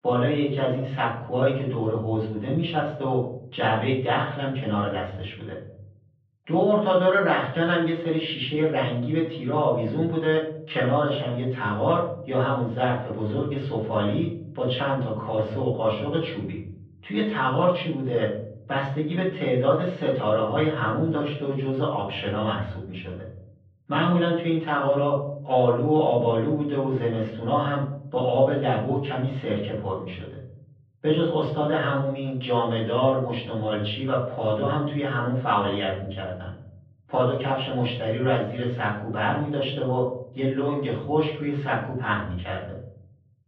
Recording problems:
off-mic speech; far
muffled; very; fading above 3.5 kHz
room echo; noticeable; dies away in 0.7 s

